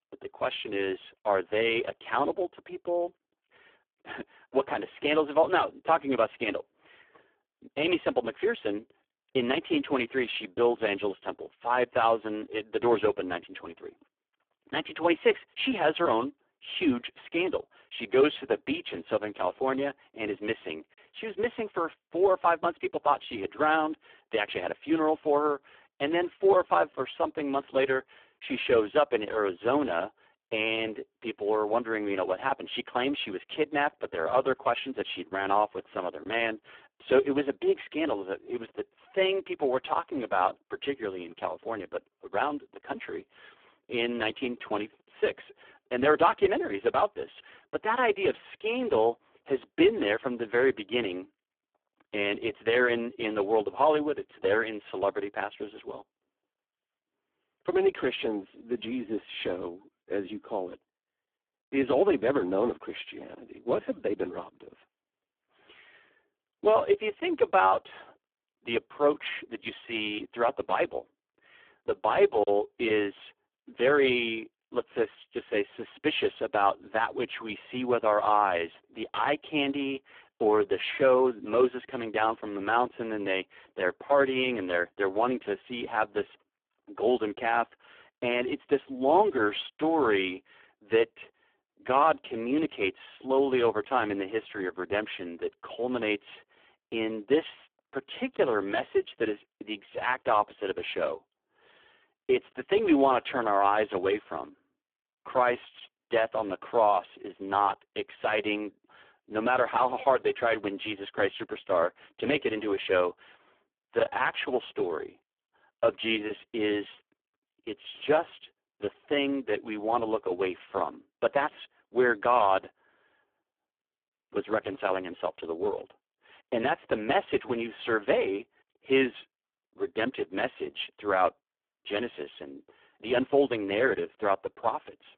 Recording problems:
phone-call audio; poor line

